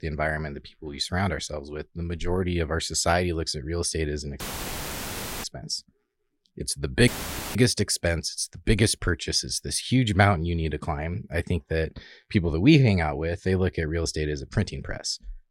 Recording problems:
audio cutting out; filled with static; at 4.5 s for 1 s and at 7 s

